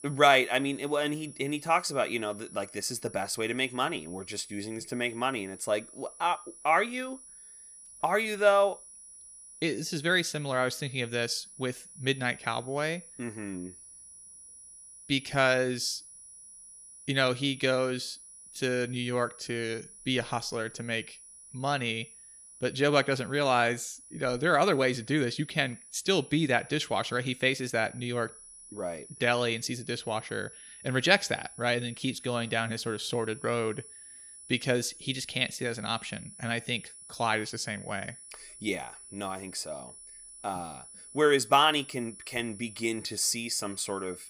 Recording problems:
high-pitched whine; noticeable; throughout; 10 kHz, 15 dB below the speech

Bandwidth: 15 kHz